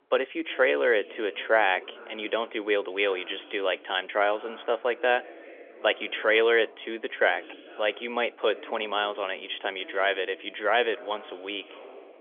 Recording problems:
phone-call audio; nothing above 3.5 kHz
voice in the background; faint; throughout; 20 dB below the speech

